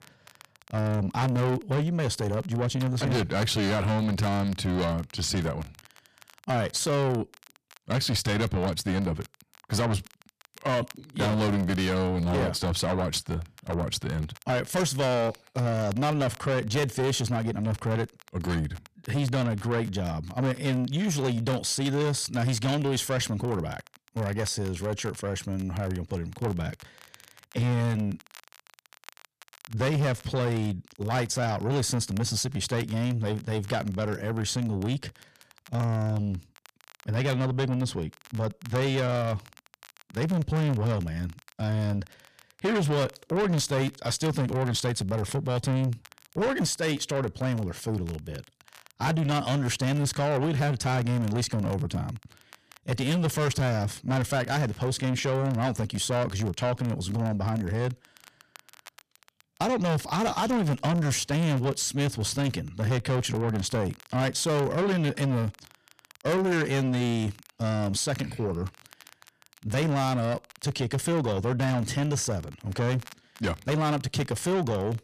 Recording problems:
distortion; heavy; 7 dB below the speech
crackle, like an old record; faint; 25 dB below the speech

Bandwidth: 14.5 kHz